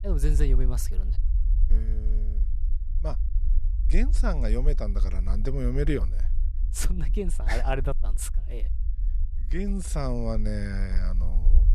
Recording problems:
low rumble; noticeable; throughout; 15 dB below the speech

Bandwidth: 13.5 kHz